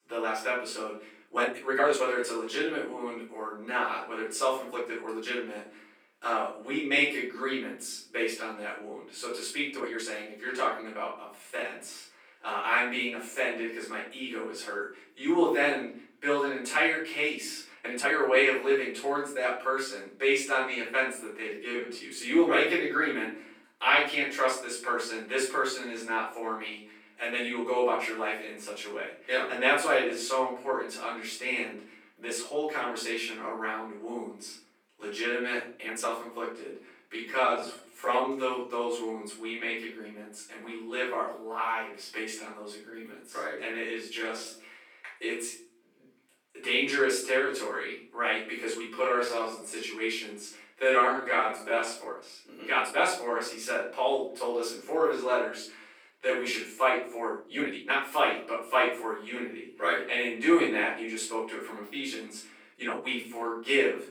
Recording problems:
off-mic speech; far
room echo; noticeable; dies away in 0.5 s
thin; somewhat; fading below 400 Hz
uneven, jittery; strongly; from 1 s to 1:04

